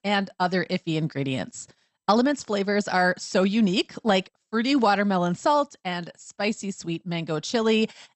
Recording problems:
garbled, watery; slightly; nothing above 8 kHz

